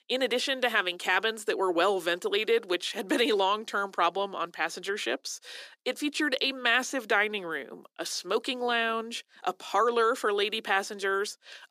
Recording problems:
thin; somewhat; fading below 350 Hz

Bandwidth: 14.5 kHz